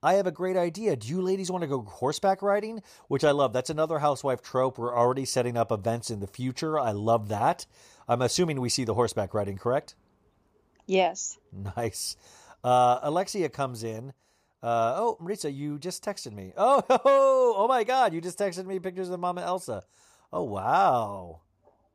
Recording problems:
none

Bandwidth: 15 kHz